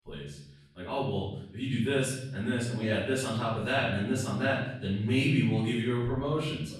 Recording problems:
off-mic speech; far
room echo; noticeable; dies away in 0.8 s

